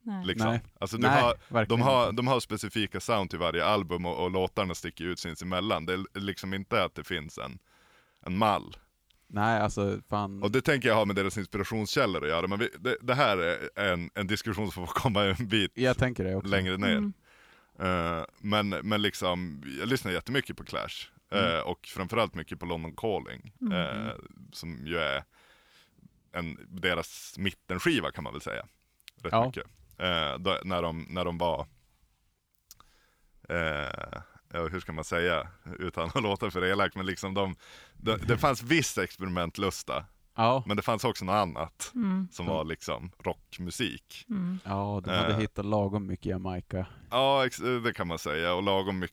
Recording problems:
none

